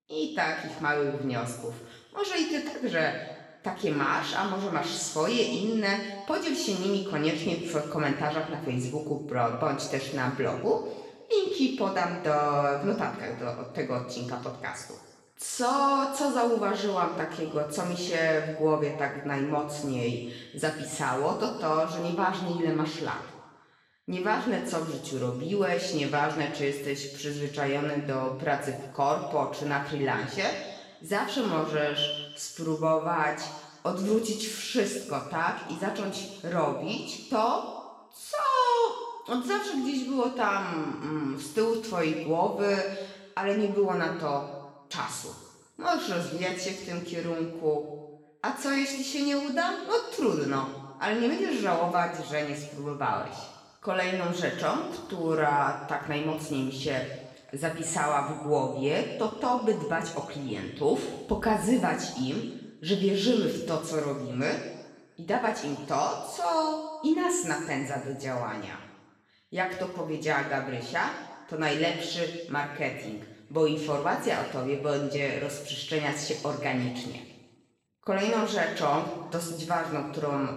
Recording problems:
off-mic speech; far
room echo; noticeable; dies away in 1.1 s

